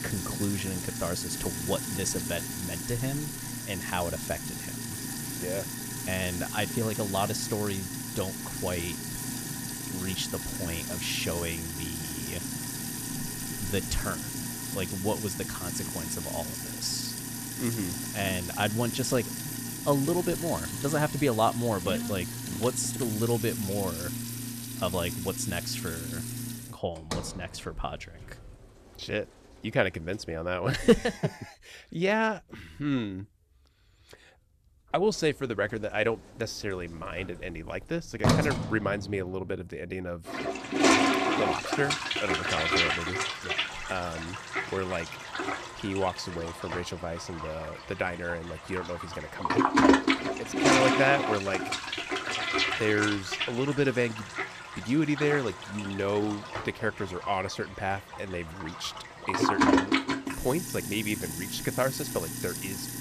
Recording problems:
household noises; very loud; throughout; as loud as the speech

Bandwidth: 14.5 kHz